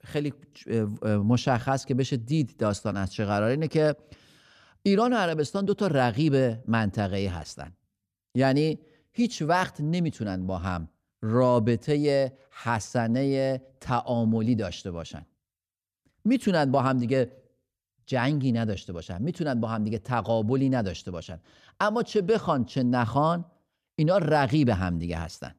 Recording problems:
none

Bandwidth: 14.5 kHz